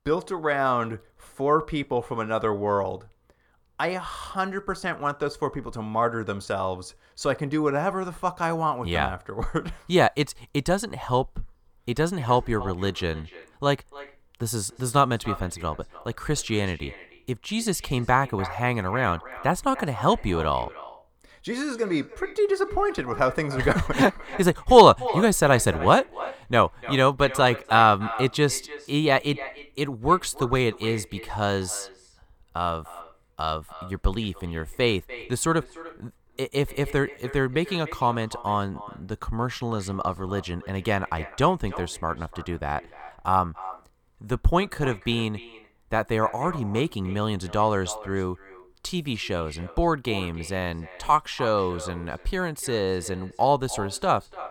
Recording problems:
echo of what is said; noticeable; from 12 s on; 300 ms later, 15 dB below the speech

